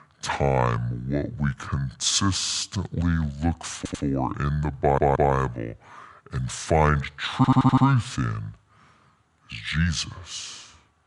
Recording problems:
wrong speed and pitch; too slow and too low; 0.7 times normal speed
audio stuttering; 4 times, first at 2.5 s

